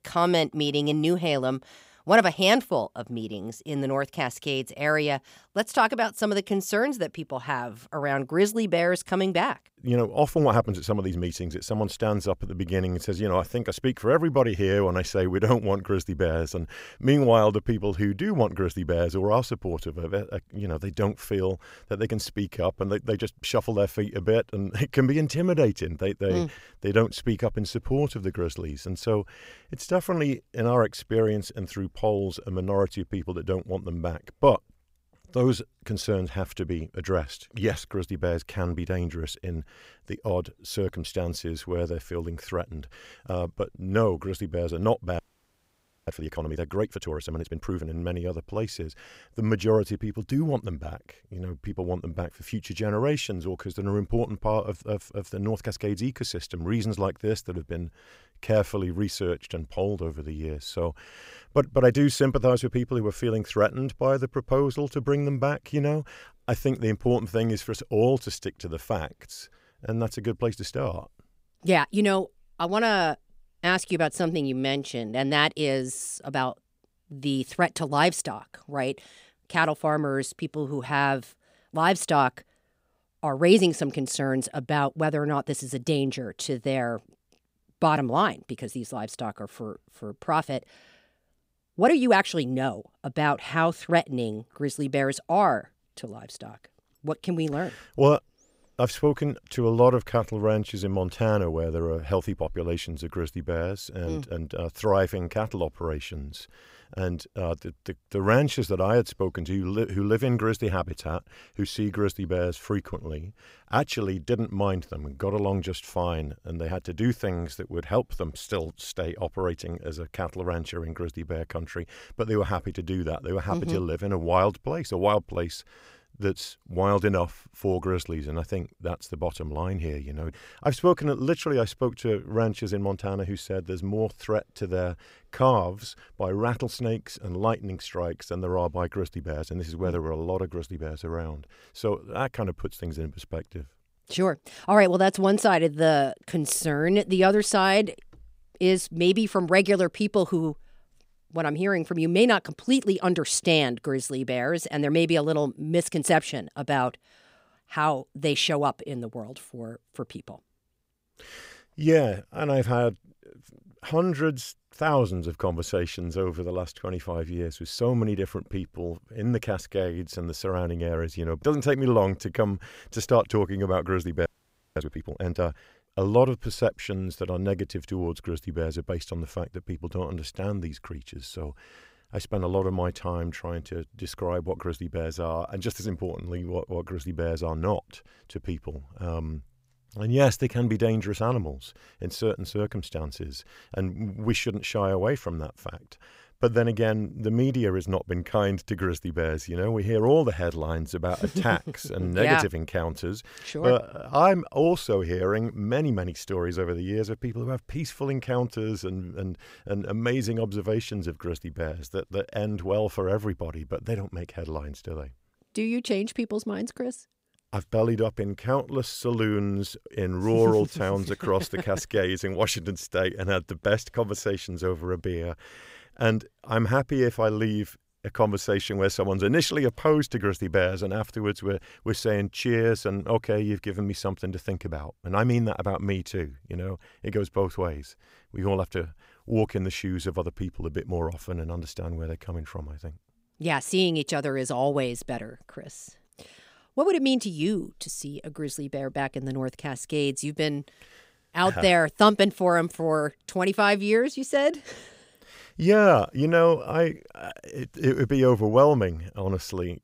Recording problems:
audio freezing; at 45 s for 1 s and at 2:54 for 0.5 s

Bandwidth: 15.5 kHz